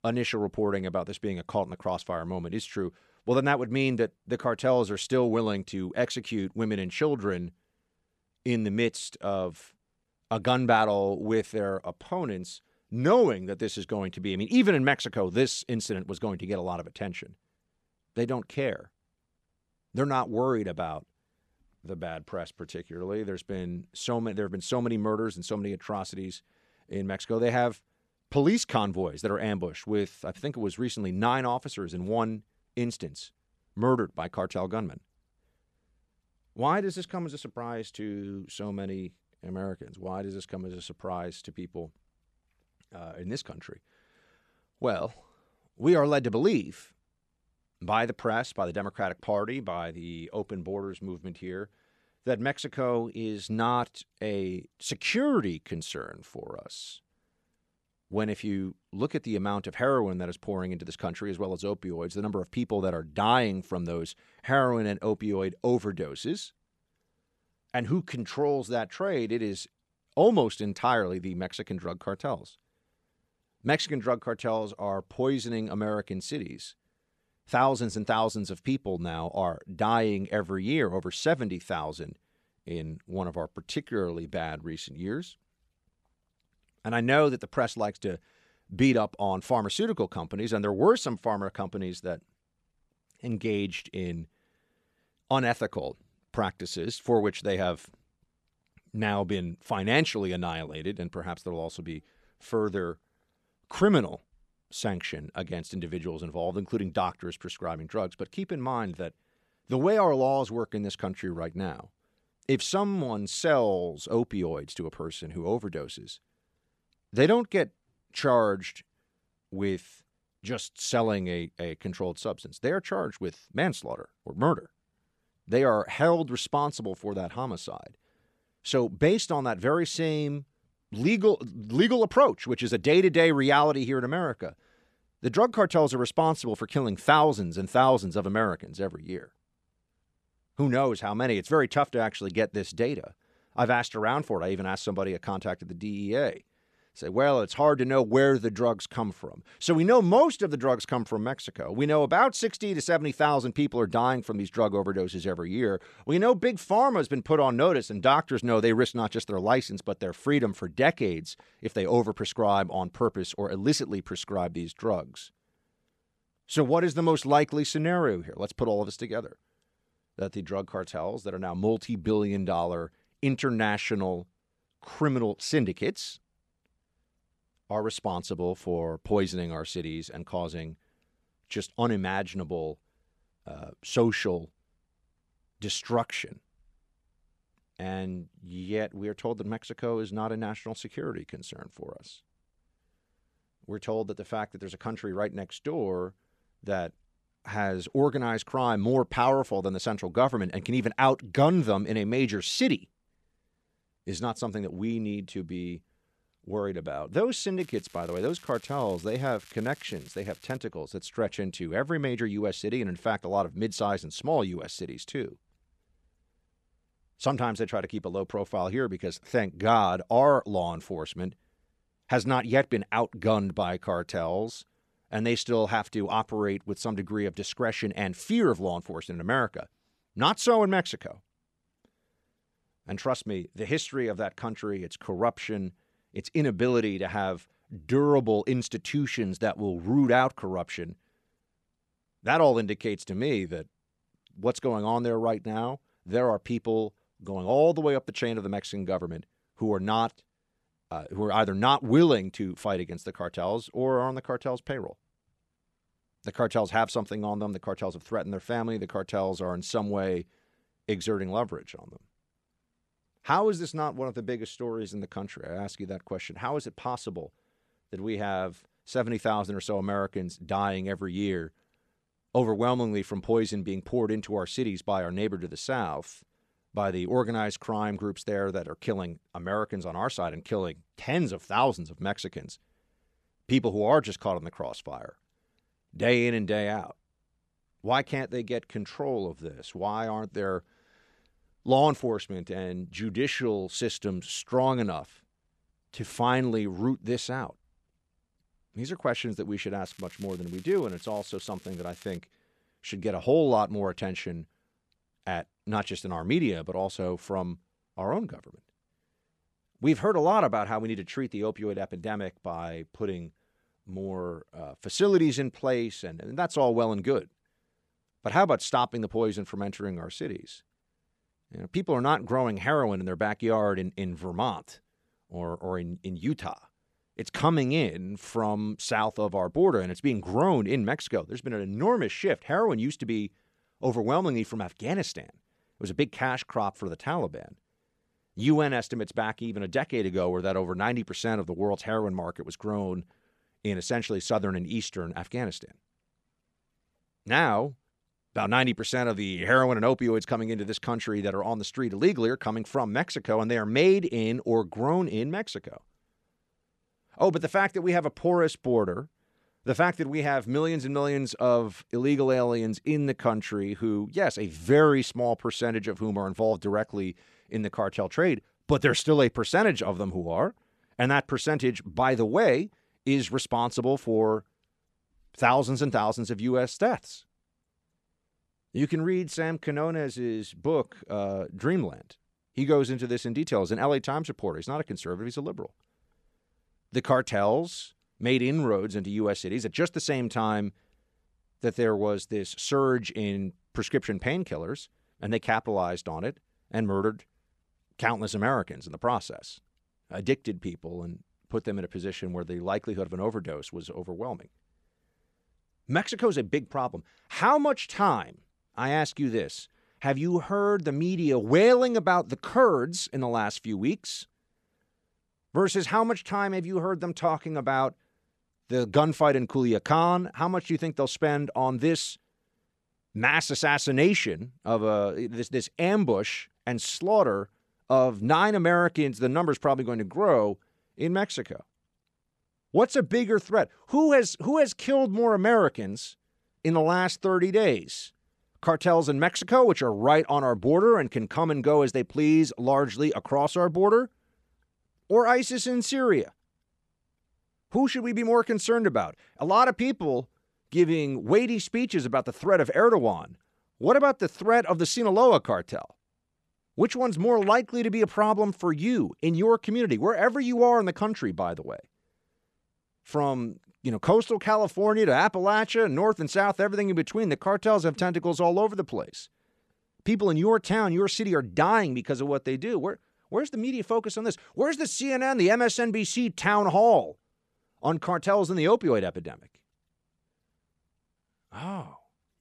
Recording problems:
crackling; faint; from 3:28 to 3:31 and from 5:00 to 5:02; 25 dB below the speech

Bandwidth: 13 kHz